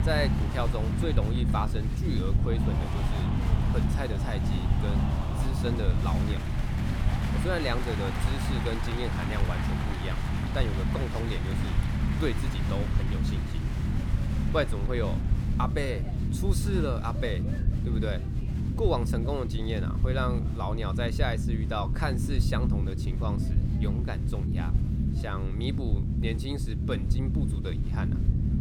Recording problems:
crowd noise; loud; throughout; 7 dB below the speech
low rumble; loud; throughout; 6 dB below the speech

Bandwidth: 17.5 kHz